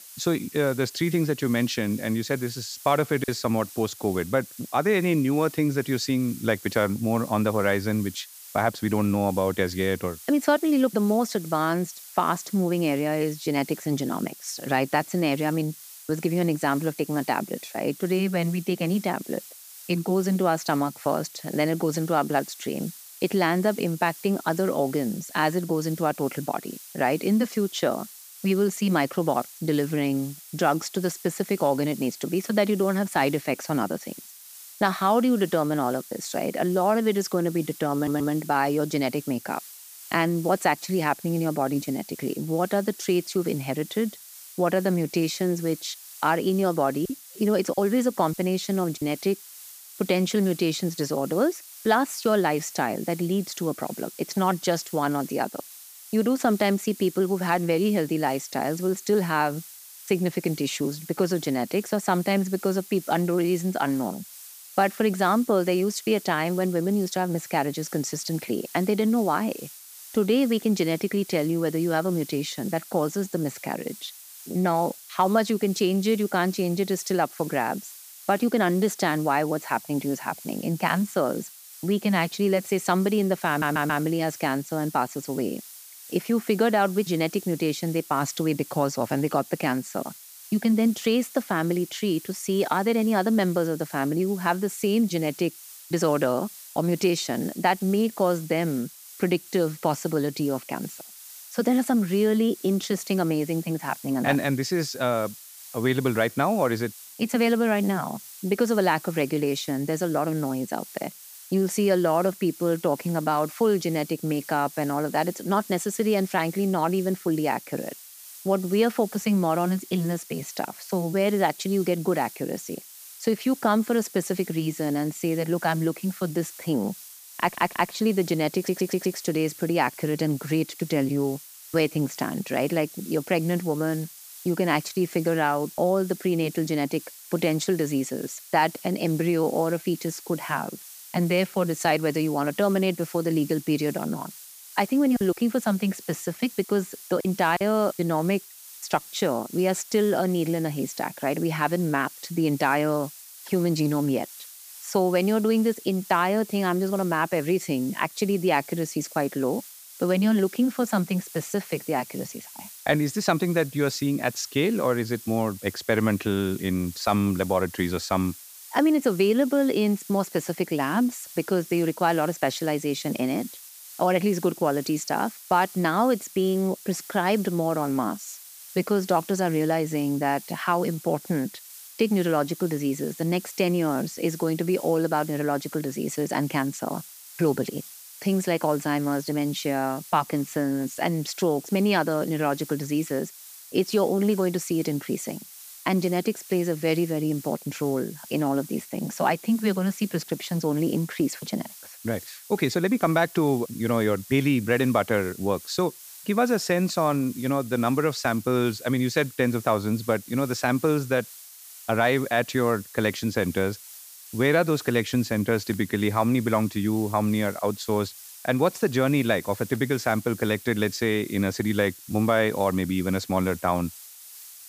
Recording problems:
hiss; noticeable; throughout; 15 dB below the speech
choppy; very; at 3 s, from 47 to 49 s and from 2:25 to 2:28; 5% of the speech affected
audio stuttering; 4 times, first at 38 s

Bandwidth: 15 kHz